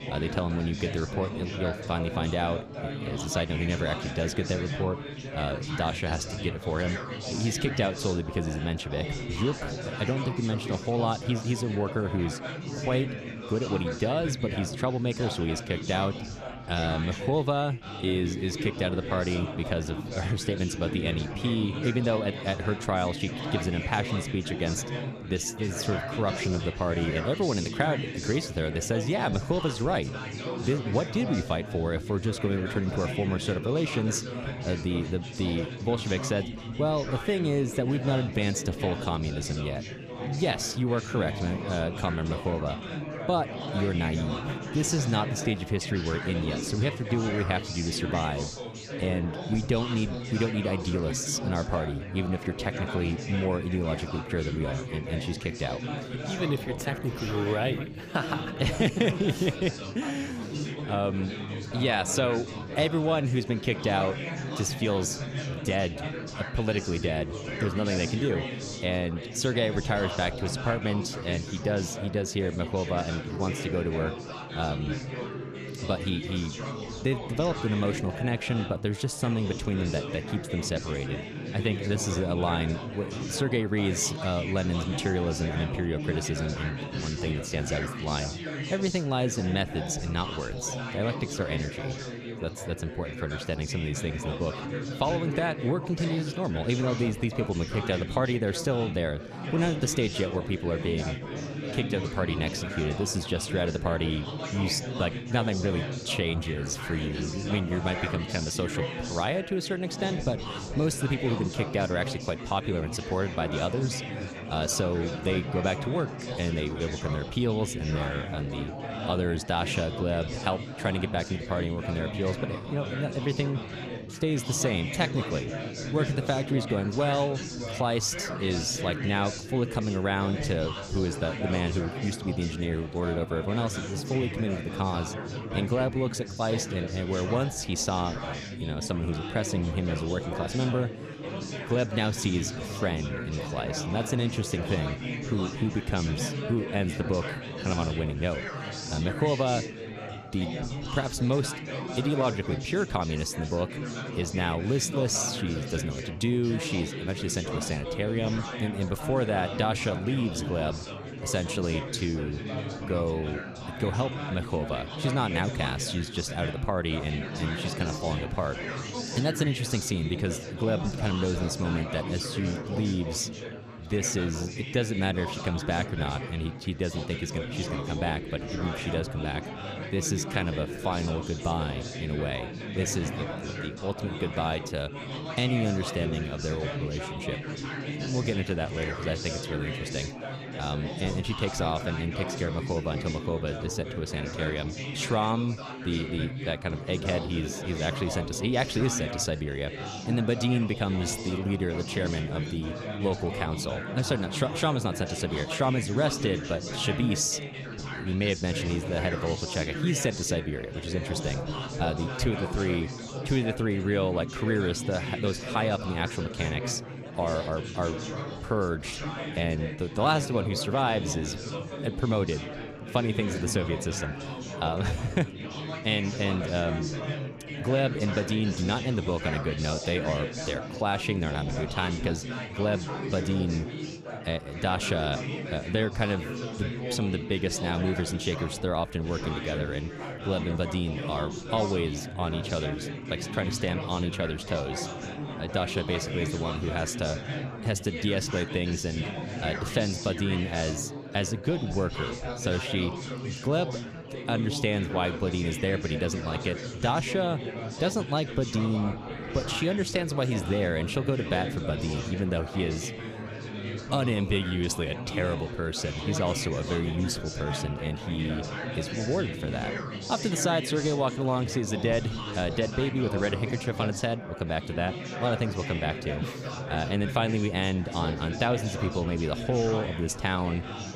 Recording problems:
chatter from many people; loud; throughout; 6 dB below the speech

